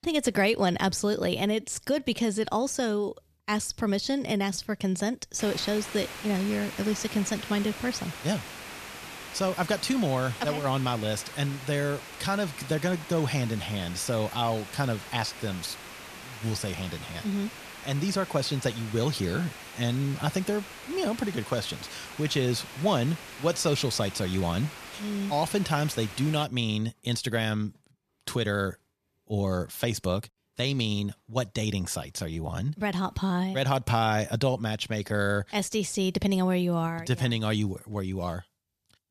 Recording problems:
hiss; noticeable; from 5.5 to 26 s; 10 dB below the speech

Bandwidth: 14.5 kHz